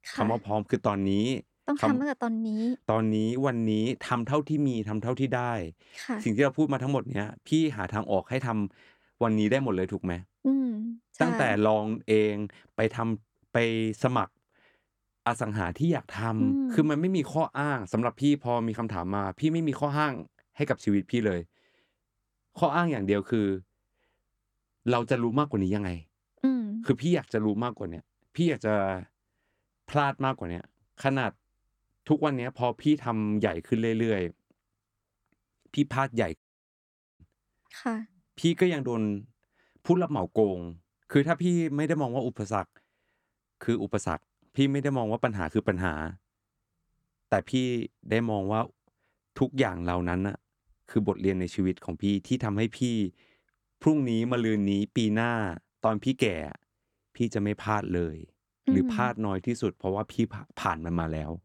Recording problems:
audio cutting out; at 36 s for 1 s

